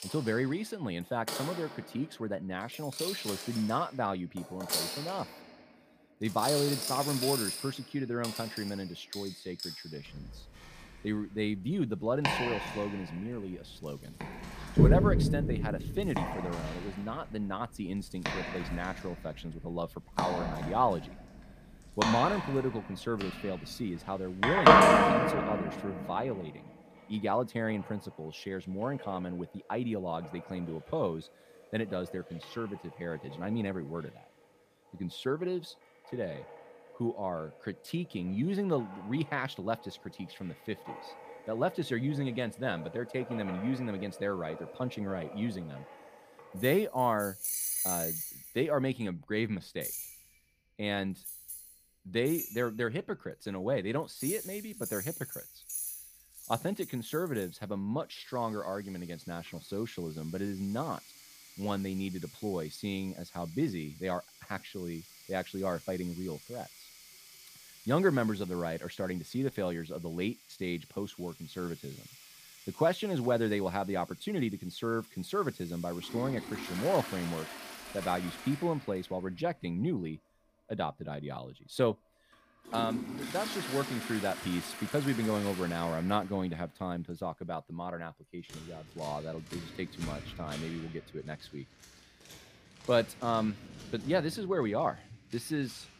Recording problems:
household noises; very loud; throughout; 2 dB above the speech

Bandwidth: 15 kHz